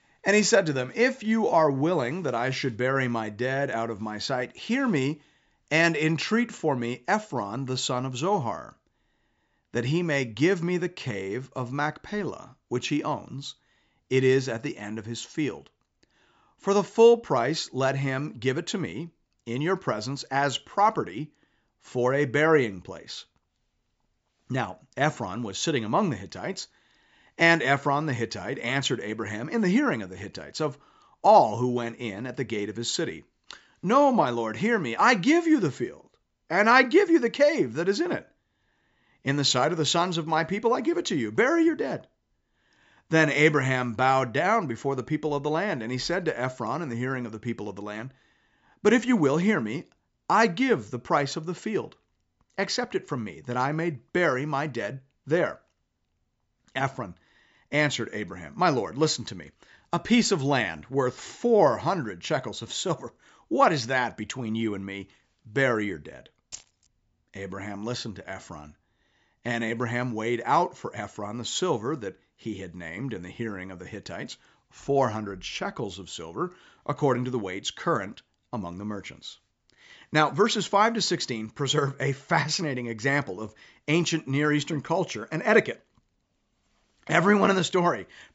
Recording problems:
high frequencies cut off; noticeable; nothing above 8 kHz
jangling keys; faint; at 1:07; peak 15 dB below the speech

